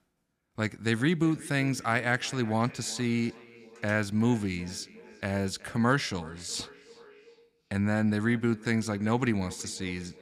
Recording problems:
echo of what is said; faint; throughout; 370 ms later, 20 dB below the speech

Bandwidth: 14.5 kHz